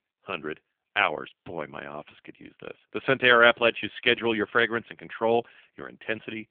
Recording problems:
phone-call audio; poor line; nothing above 3.5 kHz

